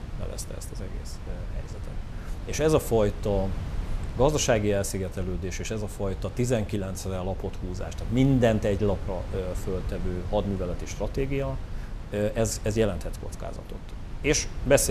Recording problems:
wind noise on the microphone; occasional gusts; 15 dB below the speech
abrupt cut into speech; at the end

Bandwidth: 14 kHz